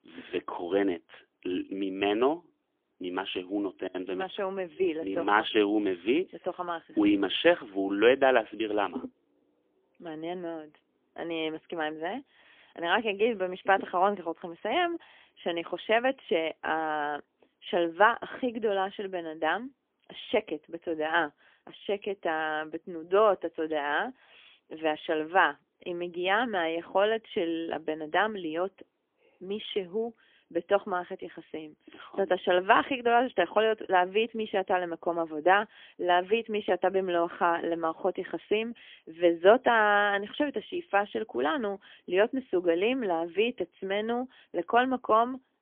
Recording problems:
phone-call audio; poor line; nothing above 3.5 kHz

